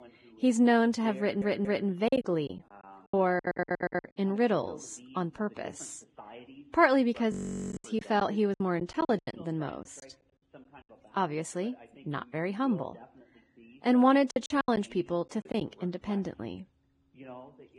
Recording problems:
garbled, watery; badly; nothing above 10 kHz
voice in the background; faint; throughout; 20 dB below the speech
audio stuttering; at 1 s and at 3.5 s
choppy; very; from 2 to 4 s, from 7.5 to 10 s and from 14 to 16 s; 17% of the speech affected
audio freezing; at 7.5 s for 0.5 s

